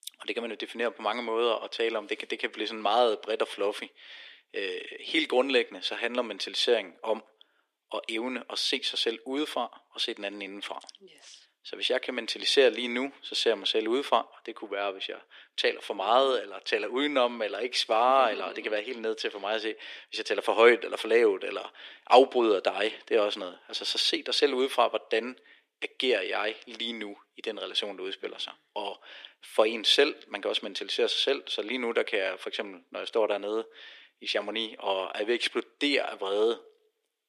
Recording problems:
thin; very; fading below 300 Hz

